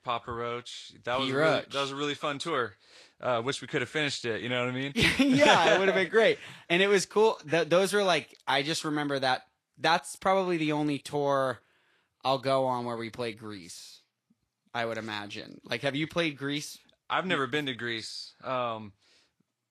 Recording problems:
garbled, watery; slightly; nothing above 12.5 kHz

